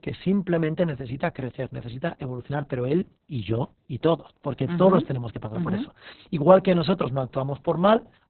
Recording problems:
garbled, watery; badly; nothing above 4 kHz

